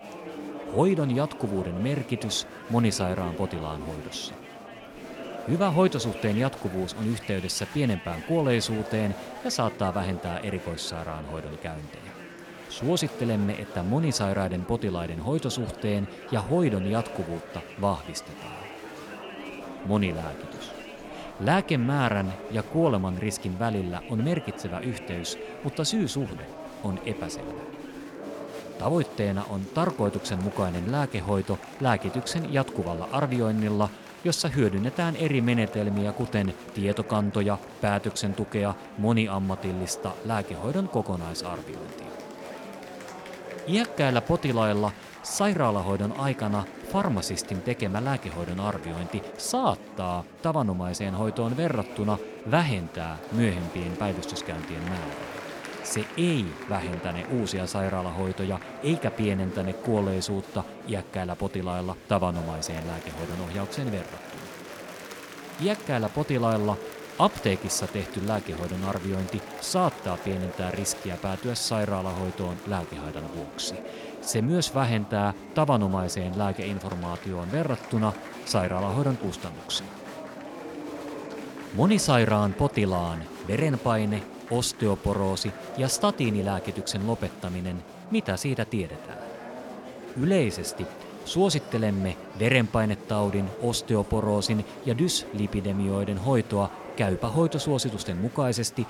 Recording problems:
murmuring crowd; noticeable; throughout; 10 dB below the speech

